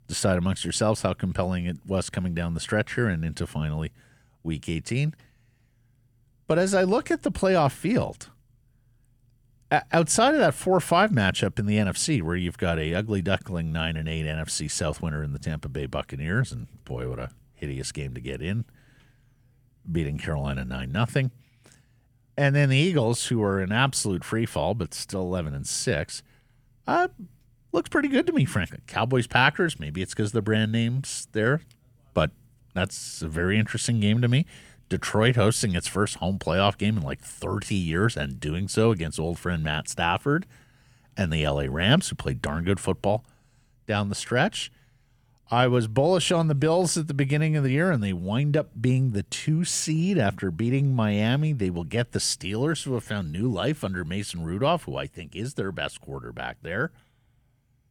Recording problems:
none

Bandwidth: 17 kHz